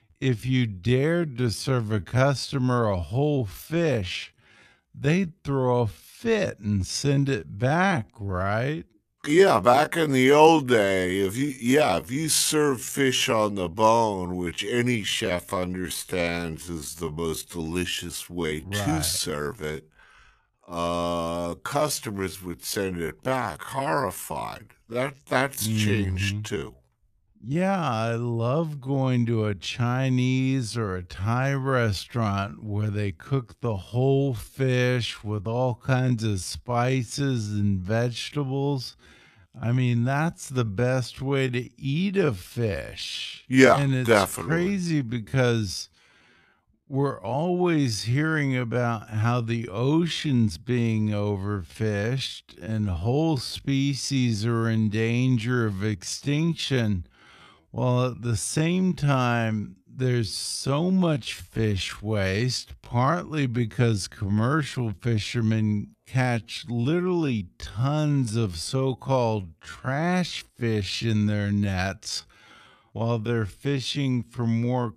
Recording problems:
wrong speed, natural pitch; too slow; 0.5 times normal speed

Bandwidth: 14.5 kHz